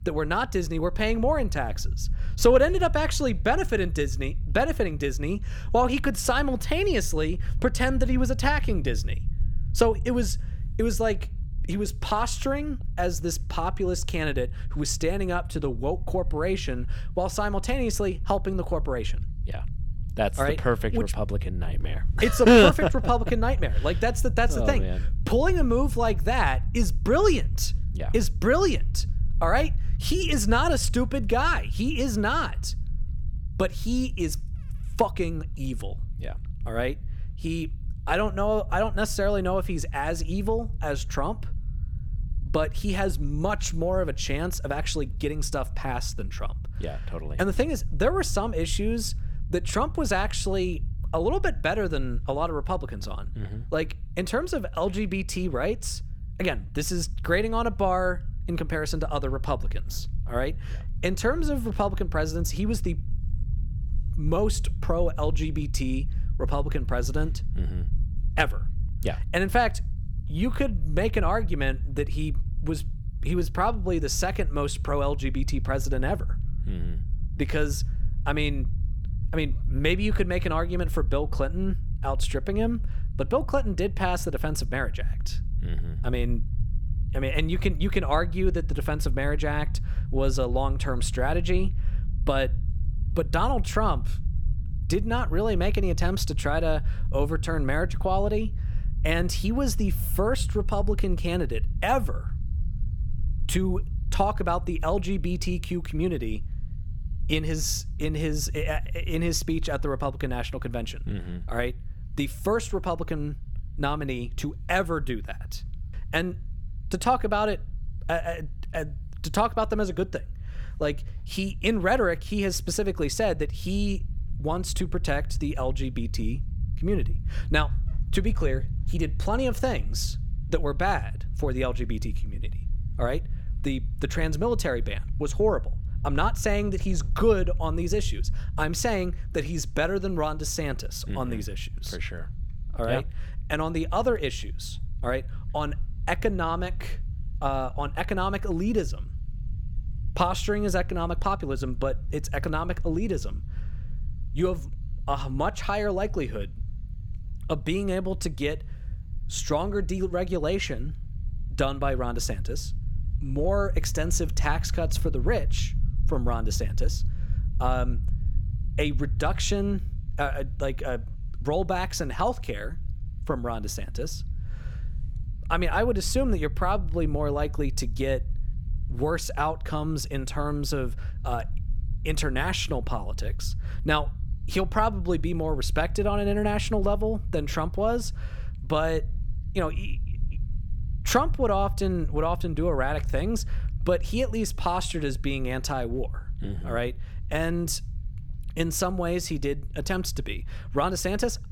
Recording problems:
low rumble; faint; throughout; 20 dB below the speech

